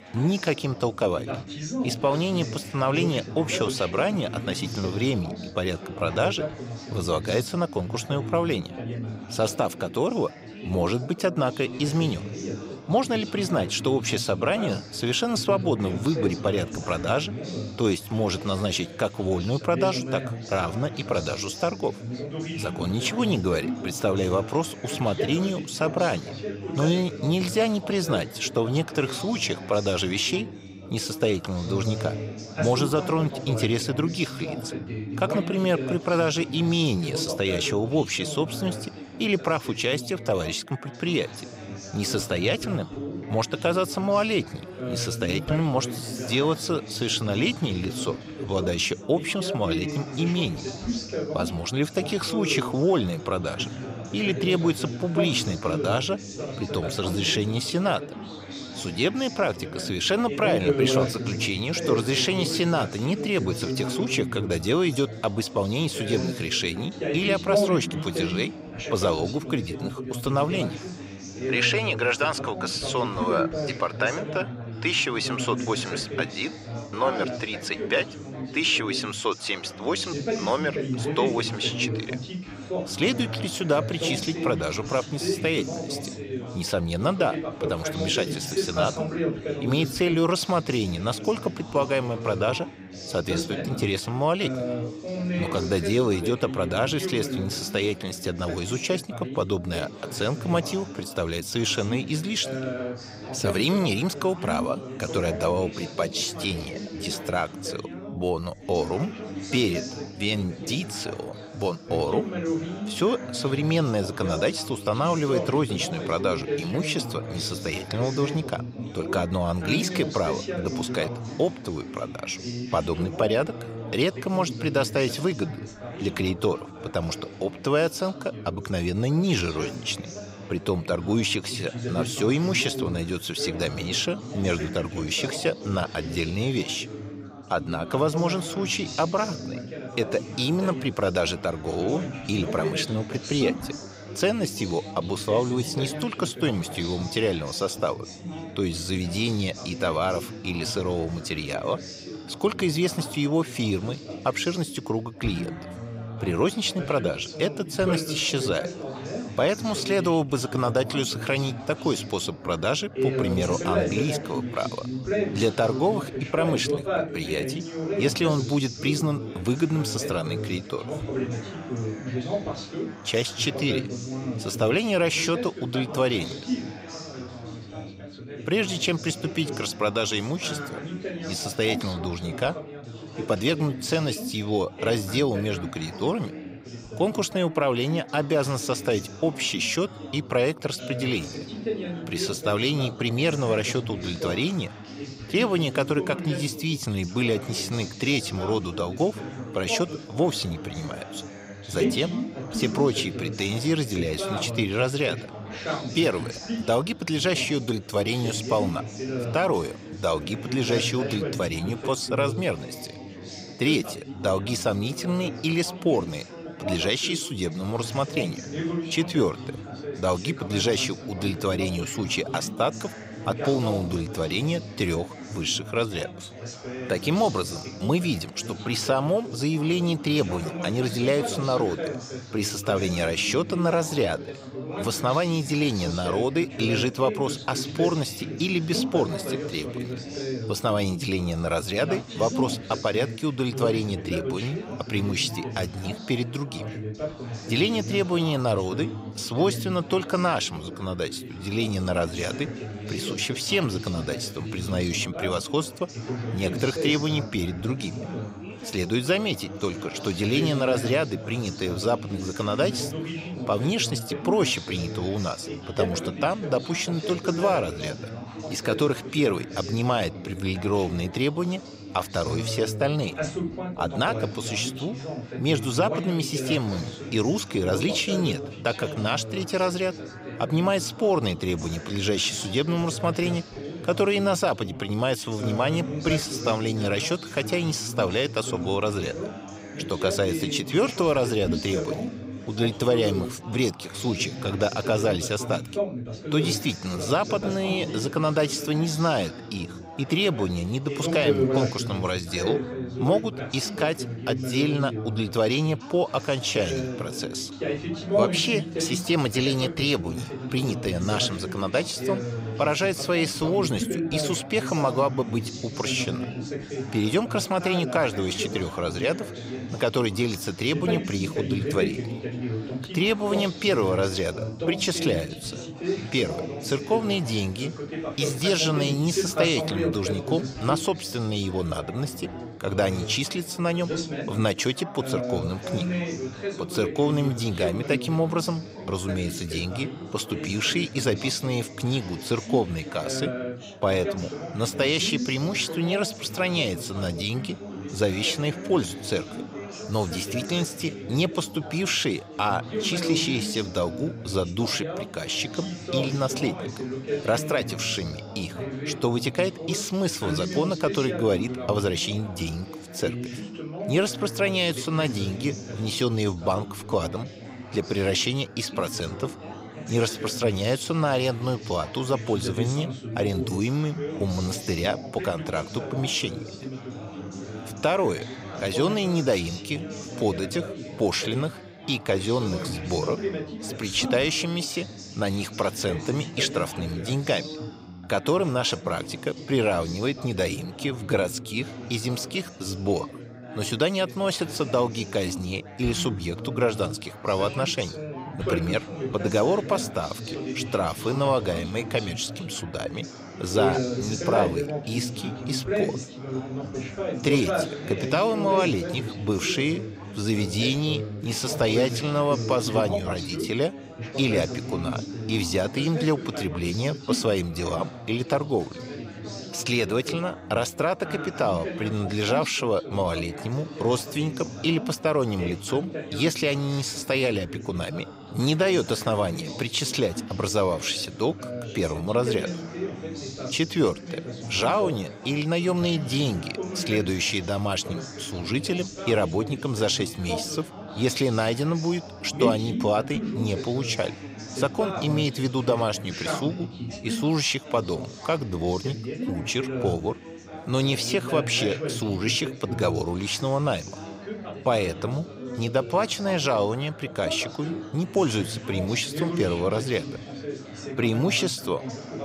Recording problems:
background chatter; loud; throughout; 4 voices, 7 dB below the speech

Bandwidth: 15.5 kHz